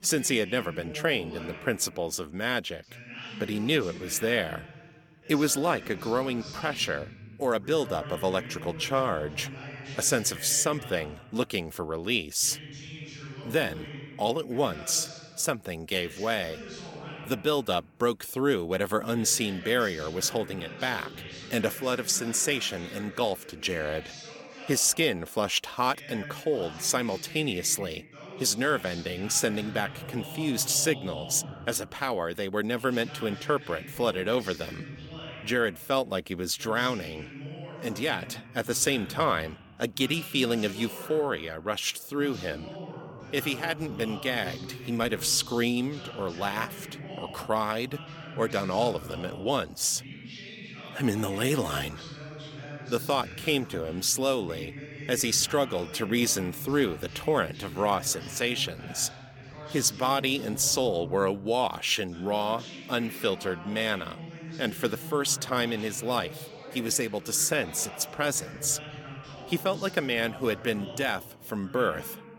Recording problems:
voice in the background; noticeable; throughout; 15 dB below the speech

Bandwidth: 17.5 kHz